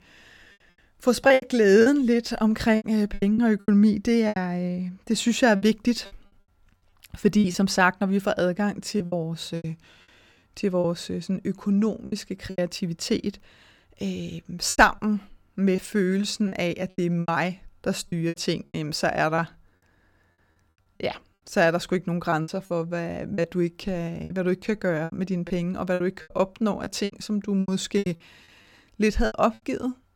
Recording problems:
choppy; very; 11% of the speech affected

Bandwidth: 18 kHz